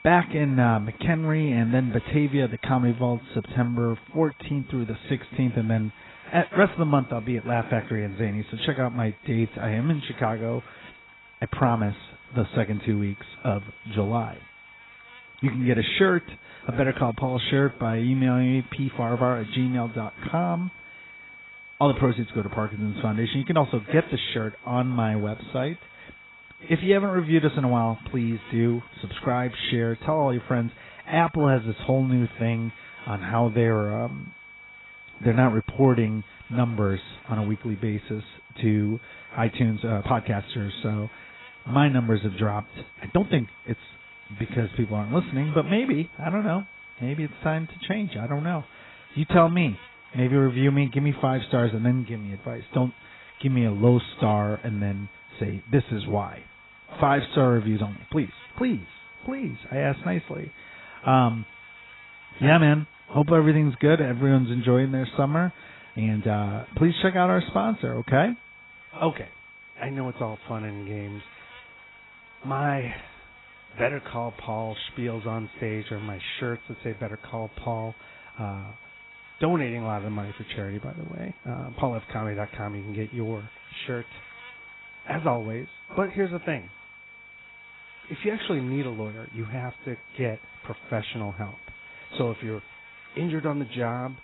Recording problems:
garbled, watery; badly; nothing above 4 kHz
electrical hum; faint; throughout; 50 Hz, 25 dB below the speech
high-pitched whine; faint; throughout; 2.5 kHz, 20 dB below the speech
uneven, jittery; strongly; from 9 s to 1:22

